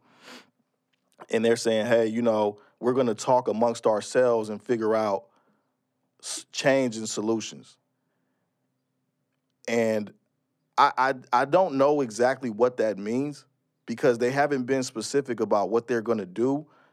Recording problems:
none

